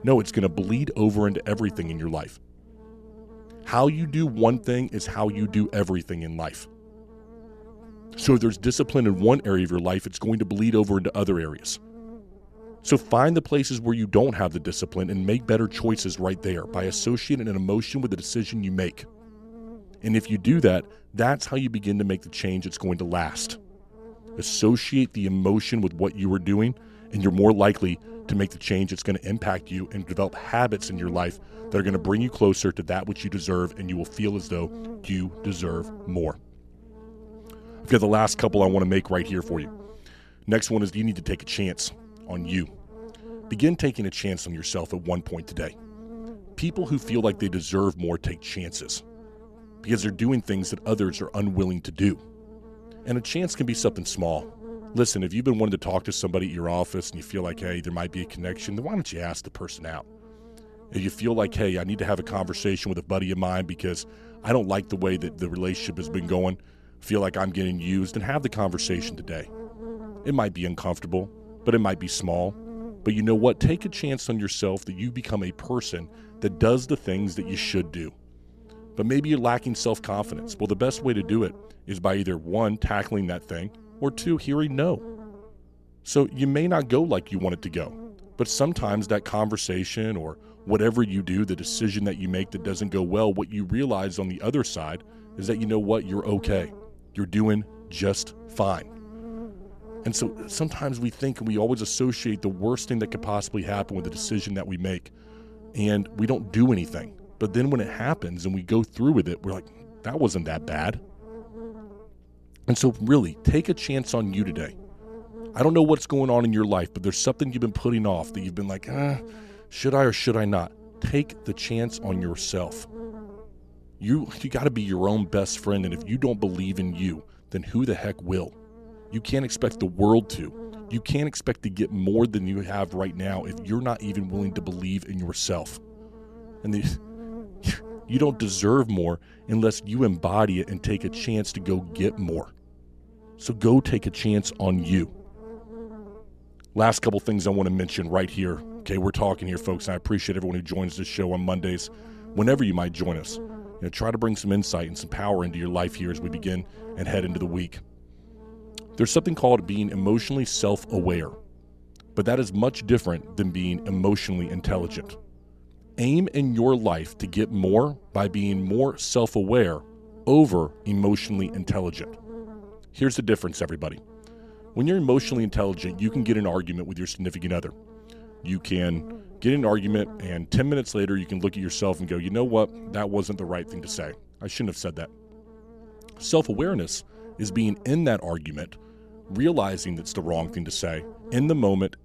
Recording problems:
electrical hum; noticeable; throughout; 60 Hz, 20 dB below the speech

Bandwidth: 14 kHz